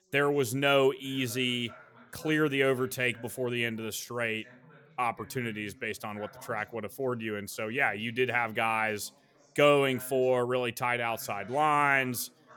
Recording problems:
background chatter; faint; throughout; 3 voices, 25 dB below the speech

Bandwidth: 18 kHz